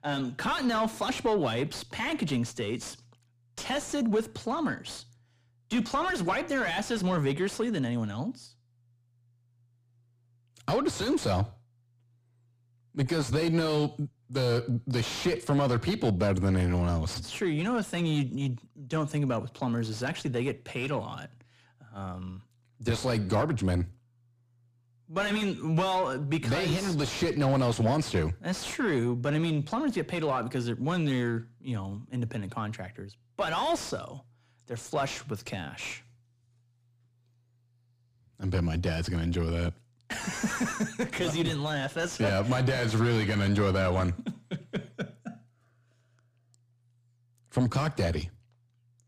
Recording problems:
distortion; heavy; 6 dB below the speech

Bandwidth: 14.5 kHz